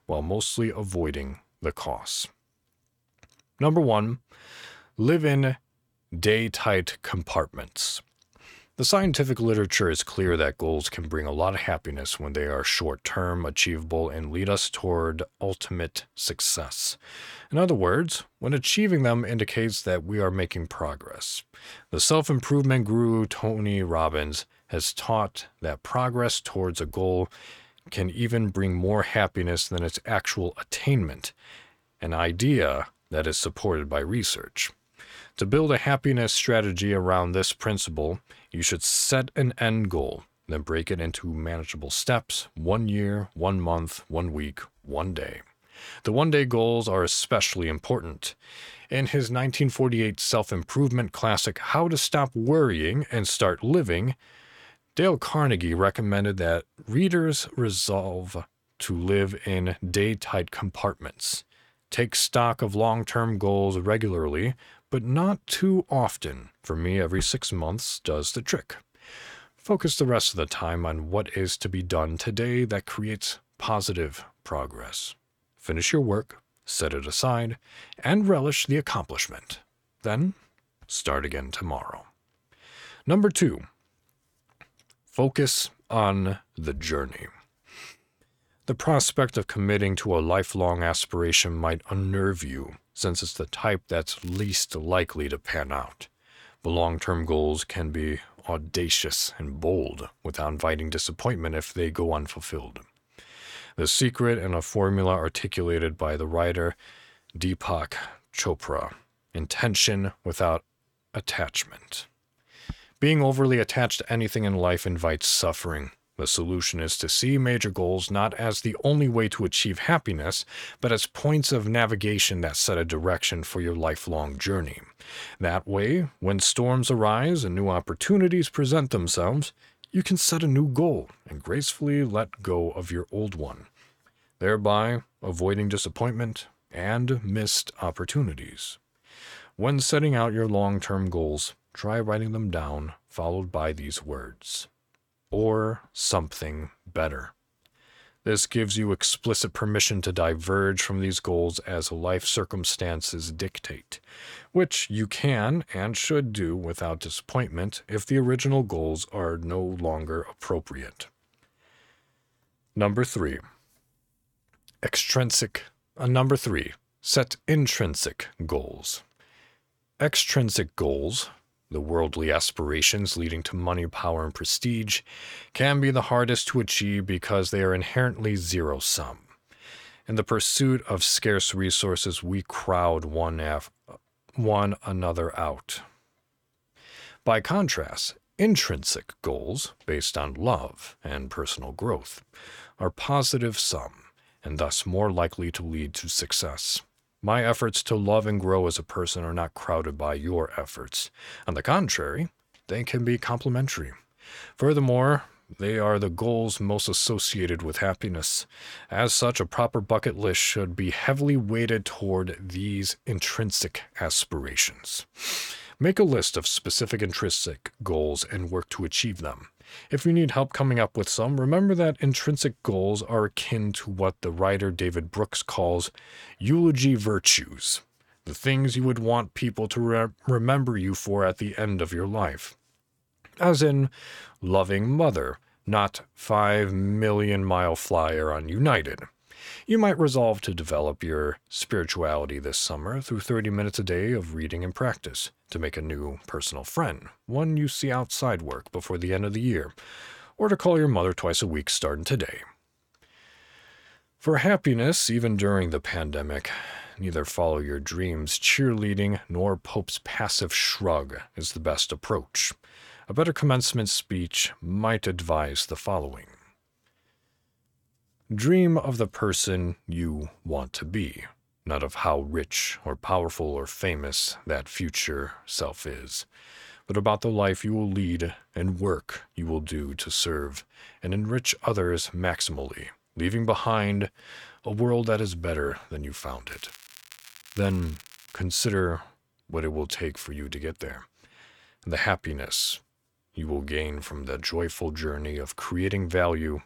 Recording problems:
crackling; faint; at 1:34 and from 4:46 to 4:48; 20 dB below the speech

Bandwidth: 18.5 kHz